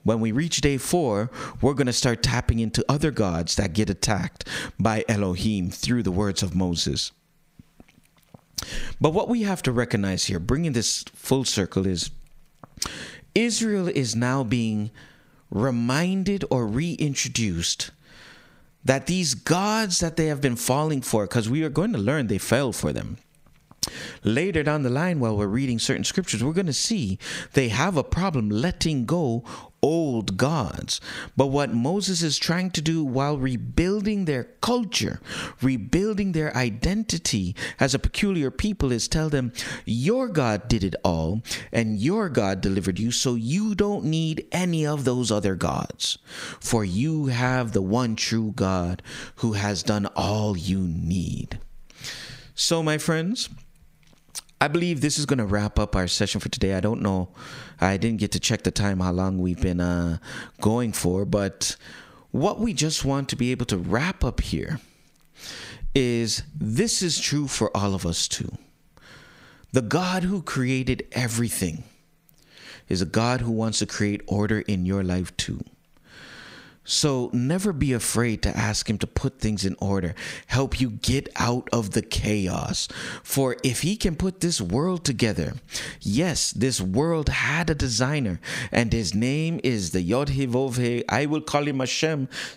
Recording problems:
squashed, flat; heavily

